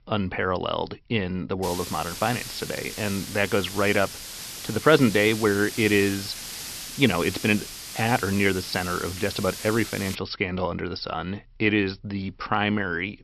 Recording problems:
high frequencies cut off; noticeable; nothing above 5.5 kHz
hiss; loud; from 1.5 to 10 s; 10 dB below the speech

